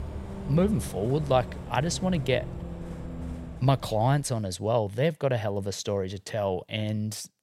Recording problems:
traffic noise; noticeable; until 4 s; 10 dB below the speech

